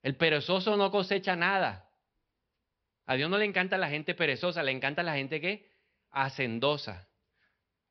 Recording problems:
high frequencies cut off; noticeable; nothing above 5.5 kHz

